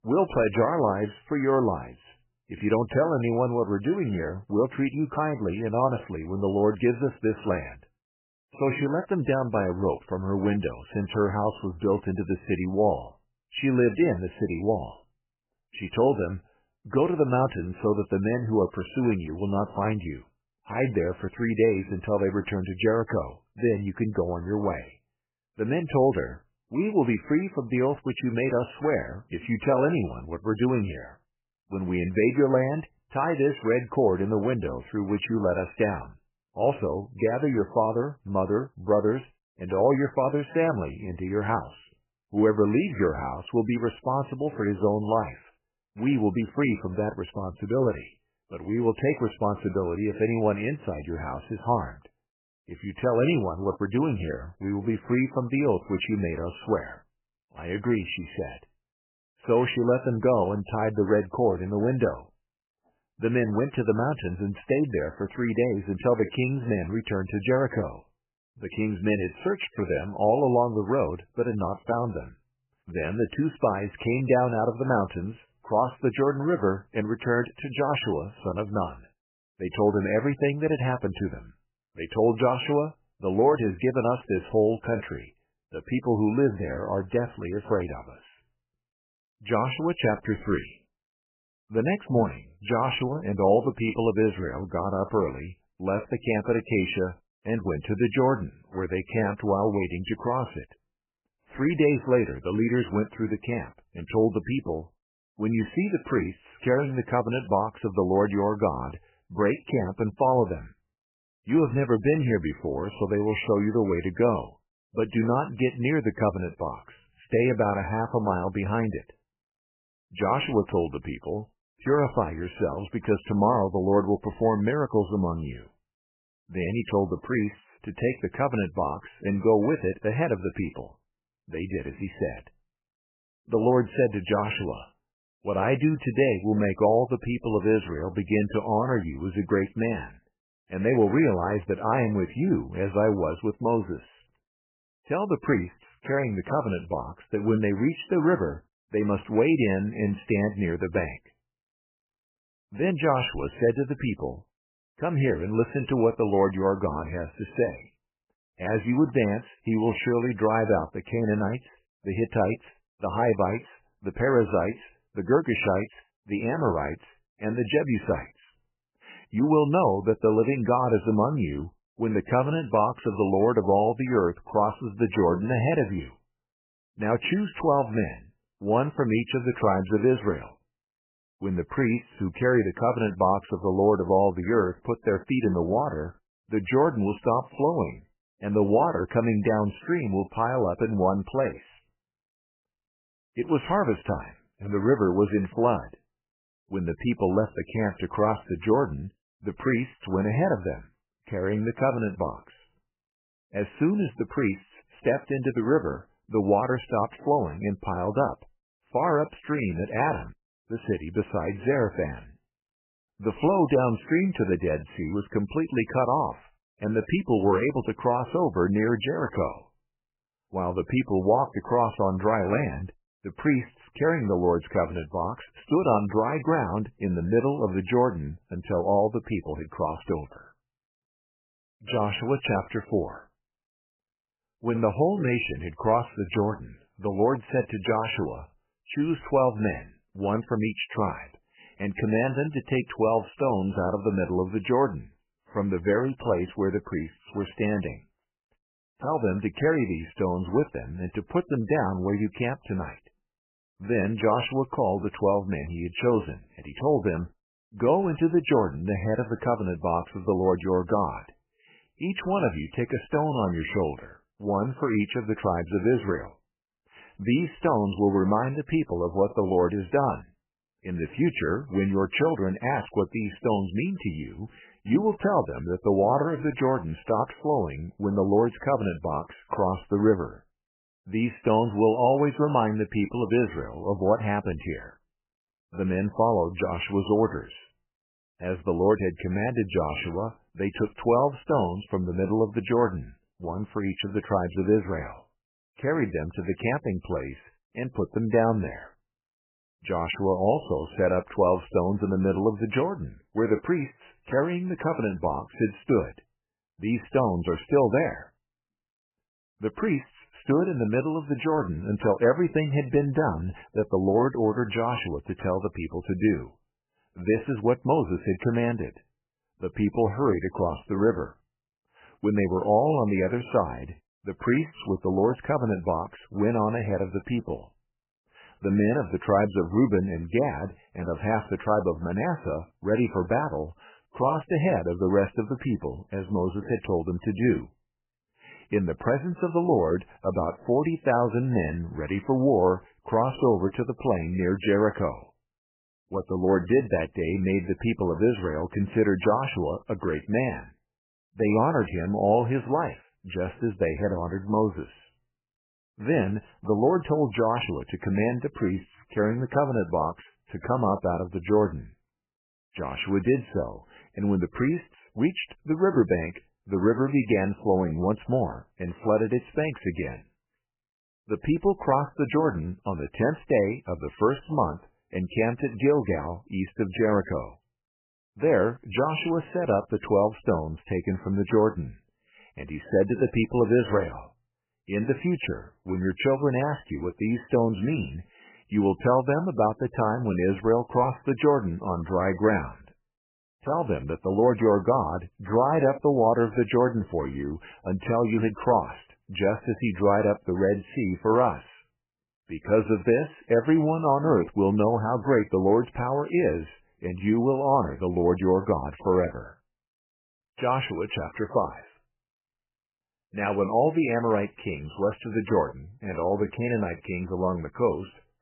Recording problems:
garbled, watery; badly; nothing above 3 kHz

